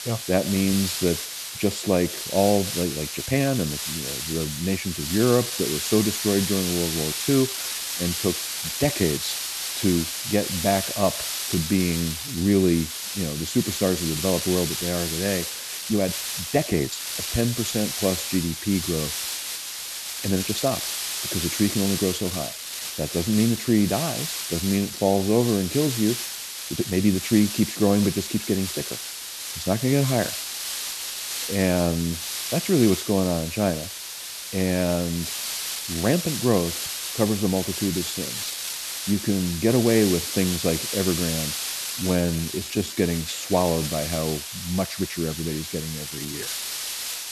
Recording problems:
hiss; loud; throughout; 4 dB below the speech
uneven, jittery; strongly; from 3.5 to 46 s

